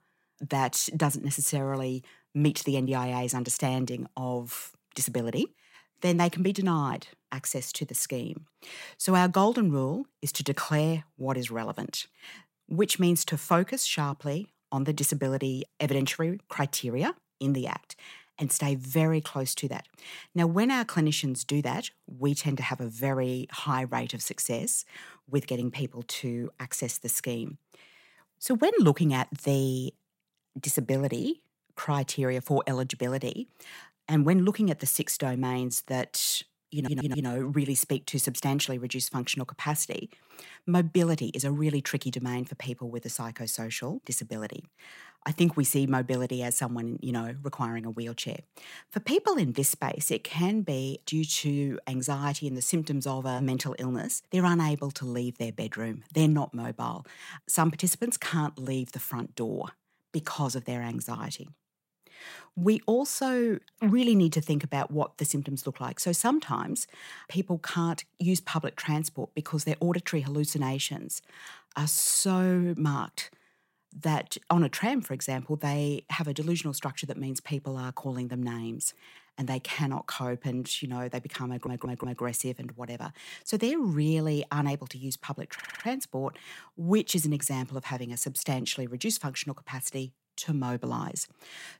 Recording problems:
audio stuttering; at 37 s, at 1:21 and at 1:26

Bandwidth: 16 kHz